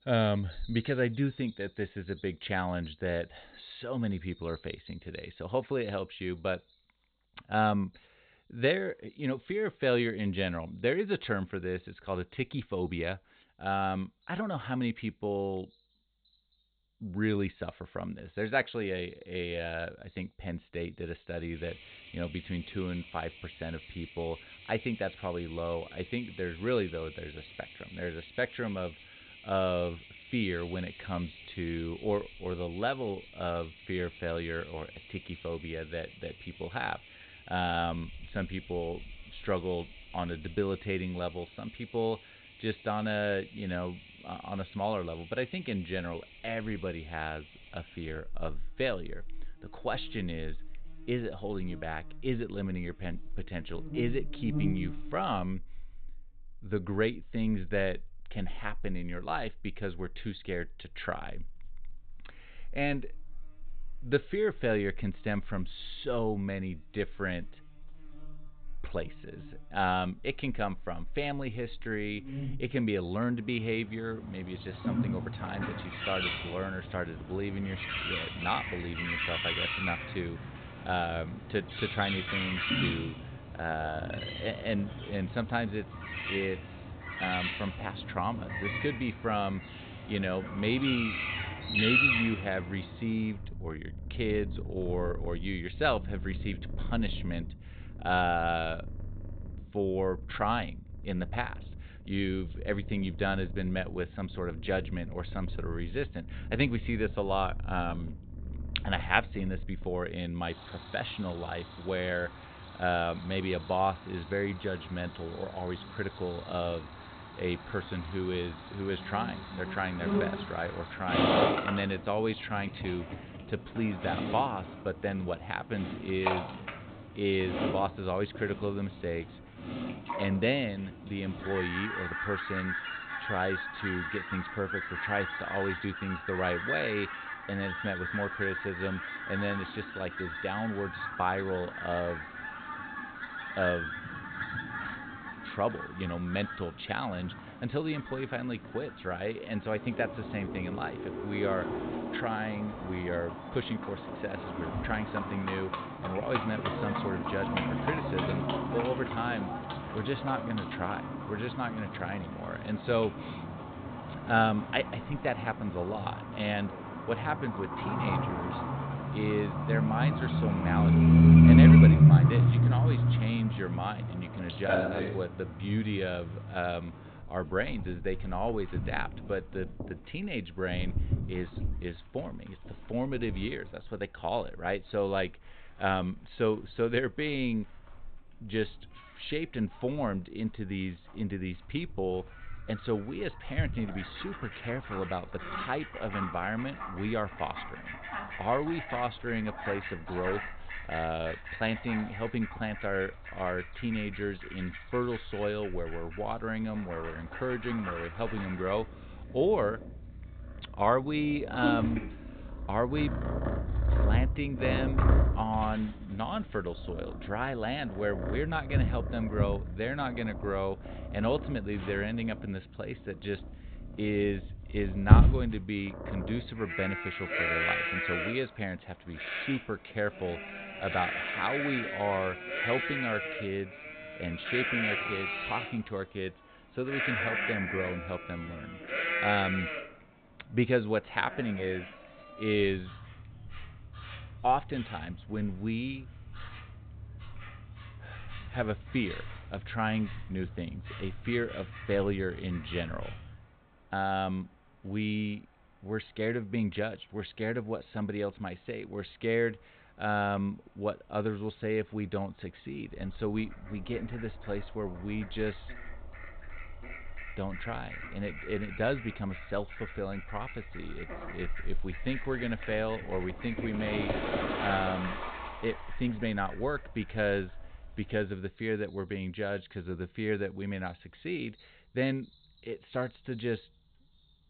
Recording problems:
high frequencies cut off; severe; nothing above 4 kHz
animal sounds; very loud; throughout; 2 dB above the speech

